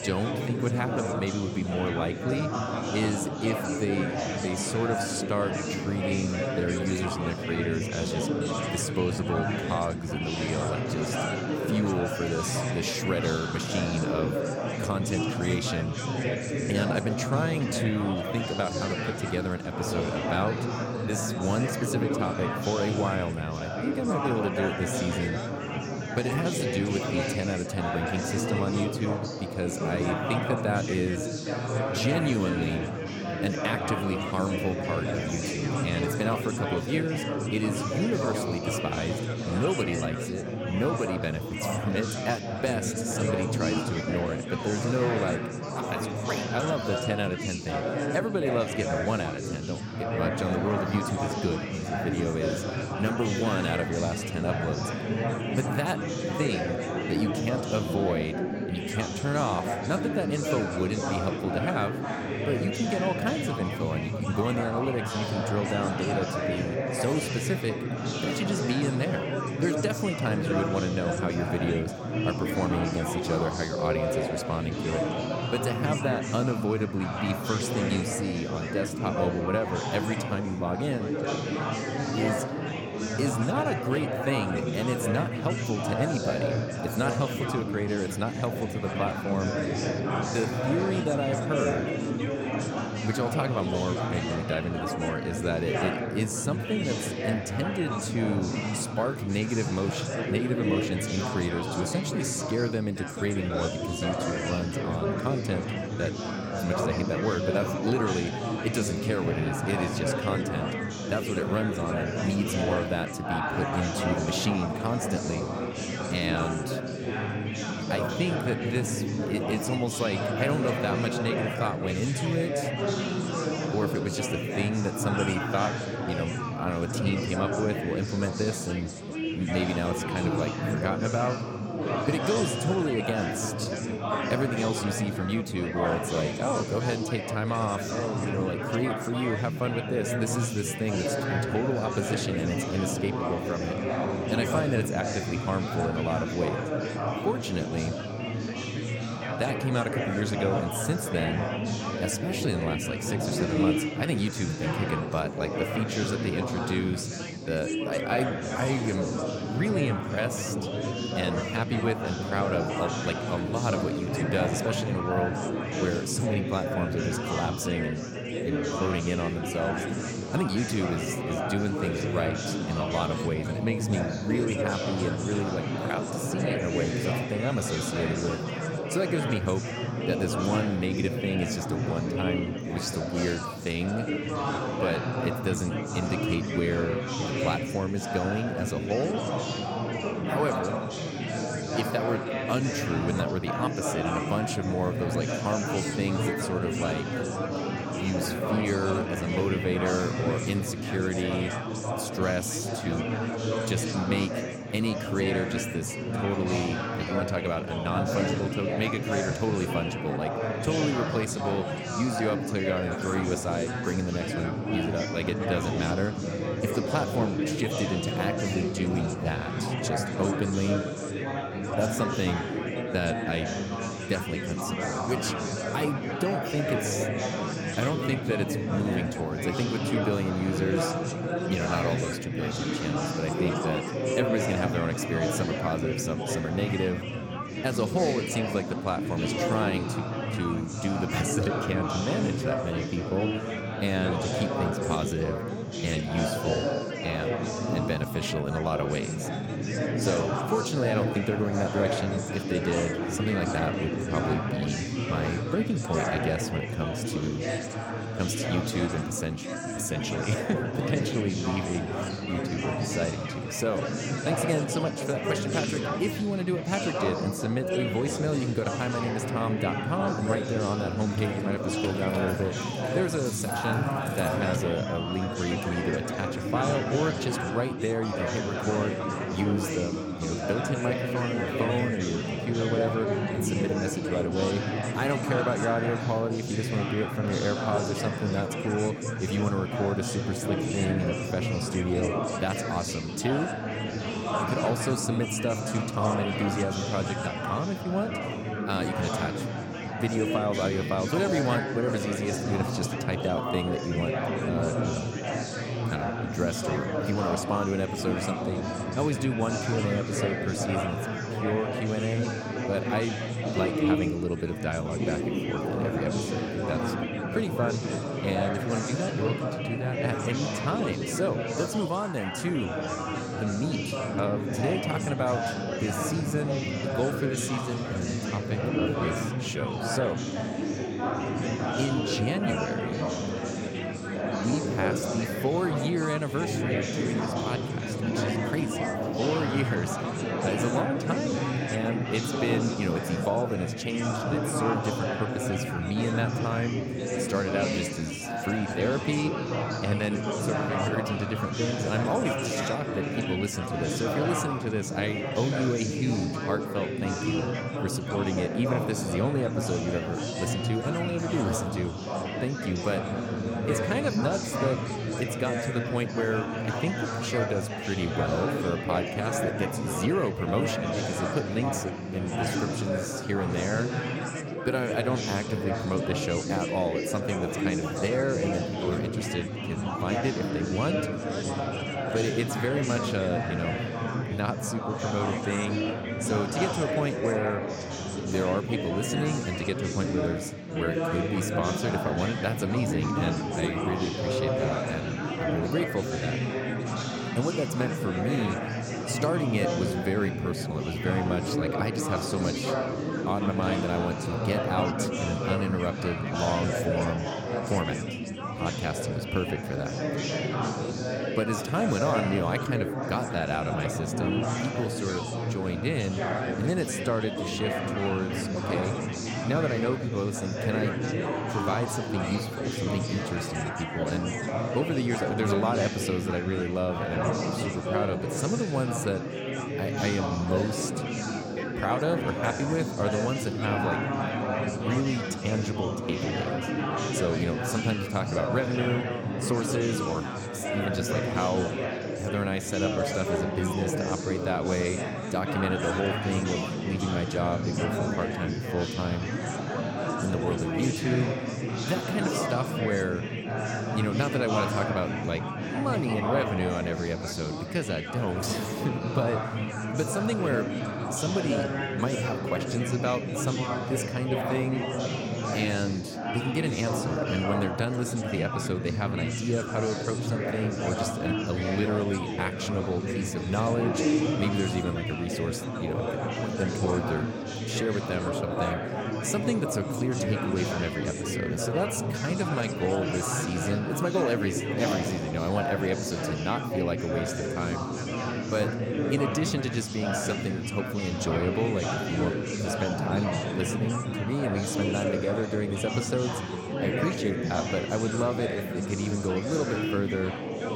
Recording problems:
chatter from many people; very loud; throughout; as loud as the speech
jangling keys; noticeable; from 4:31 to 4:35; peak 9 dB below the speech

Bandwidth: 17 kHz